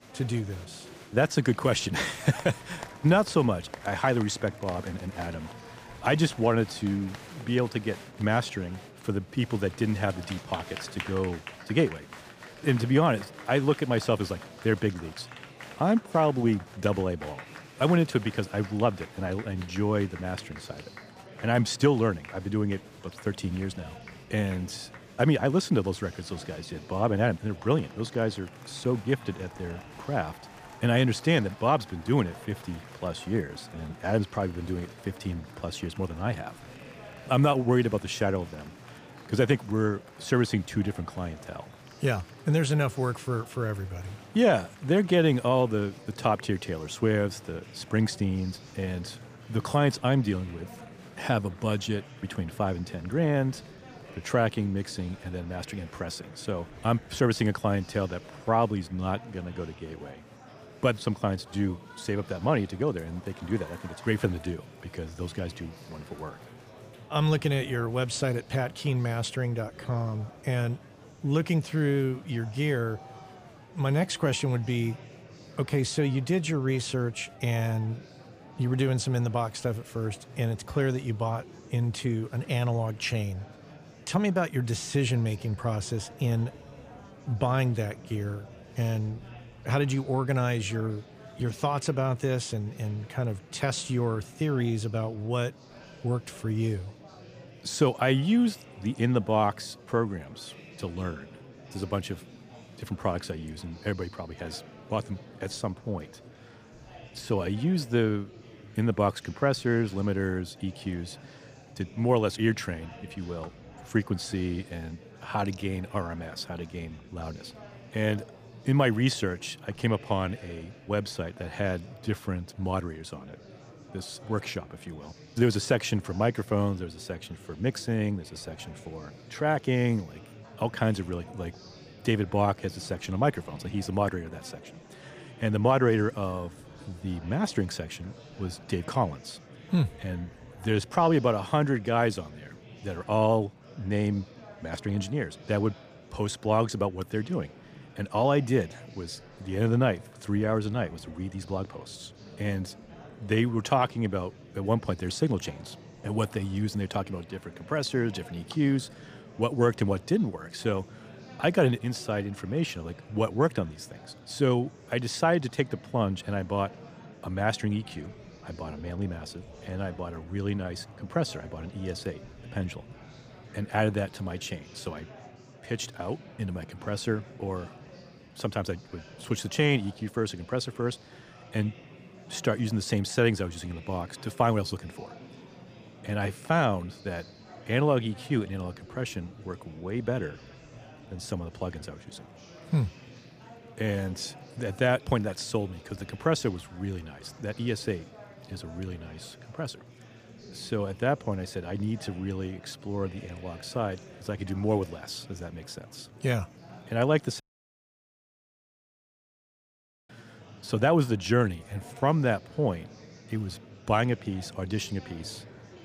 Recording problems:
murmuring crowd; noticeable; throughout; 20 dB below the speech
audio cutting out; at 3:27 for 2.5 s

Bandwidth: 15 kHz